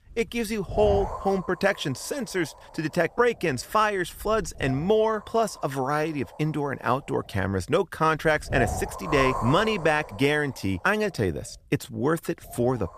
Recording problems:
wind noise on the microphone; heavy; 8 dB below the speech

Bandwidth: 15 kHz